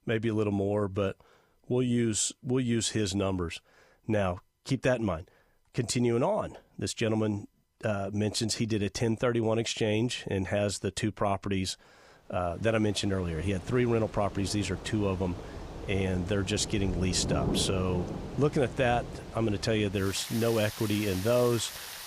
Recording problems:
rain or running water; loud; from 13 s on; 9 dB below the speech

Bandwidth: 15 kHz